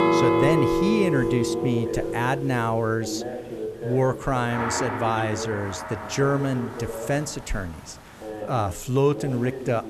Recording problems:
background music; loud; throughout; 1 dB below the speech
voice in the background; loud; throughout; 10 dB below the speech
hiss; faint; throughout; 25 dB below the speech

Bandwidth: 13.5 kHz